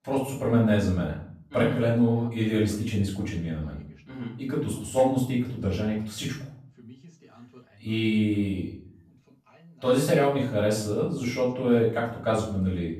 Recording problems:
off-mic speech; far
room echo; noticeable; dies away in 0.5 s
voice in the background; faint; throughout; 30 dB below the speech

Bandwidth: 14.5 kHz